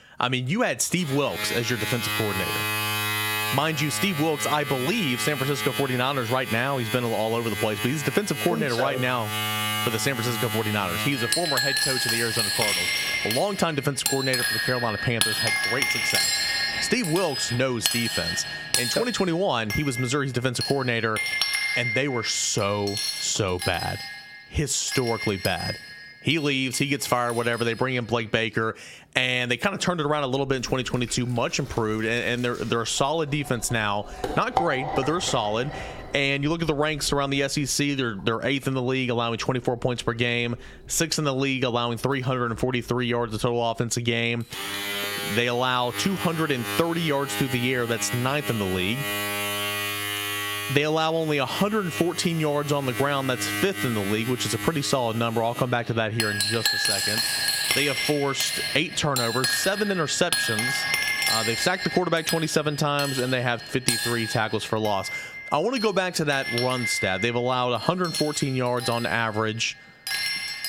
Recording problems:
squashed, flat; somewhat, background pumping
household noises; loud; throughout; 2 dB below the speech

